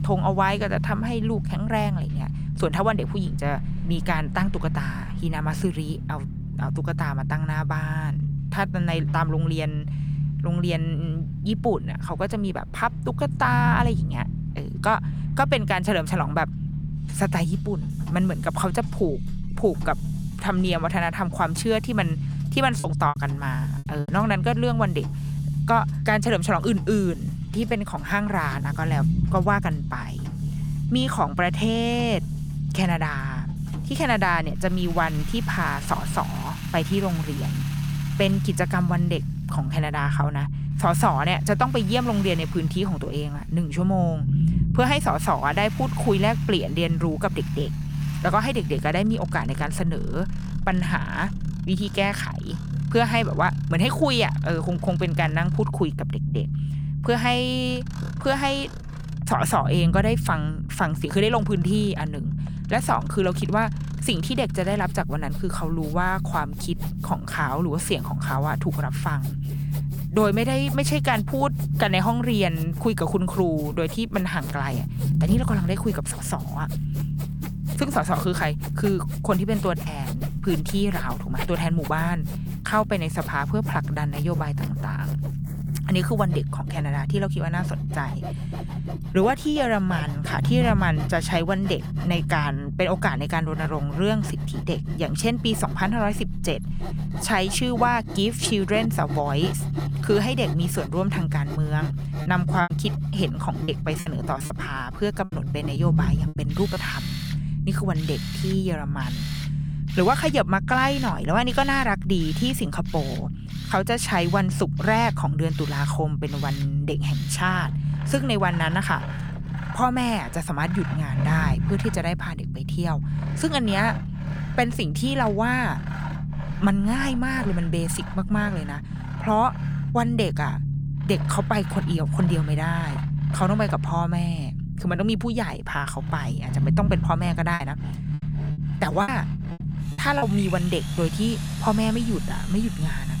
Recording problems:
machinery noise; noticeable; throughout; 15 dB below the speech
low rumble; noticeable; throughout; 15 dB below the speech
choppy; very; from 23 to 24 s, from 1:43 to 1:47 and from 2:18 to 2:20; 12% of the speech affected

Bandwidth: 18.5 kHz